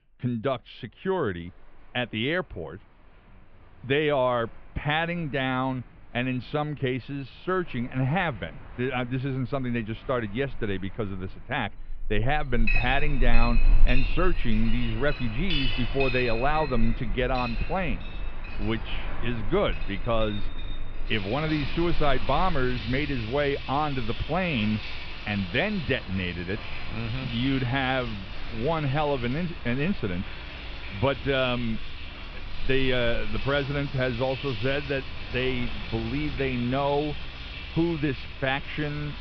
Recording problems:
muffled; very; fading above 3 kHz
high frequencies cut off; slight; nothing above 5.5 kHz
household noises; loud; from 12 s on; 7 dB below the speech
animal sounds; noticeable; throughout; 15 dB below the speech

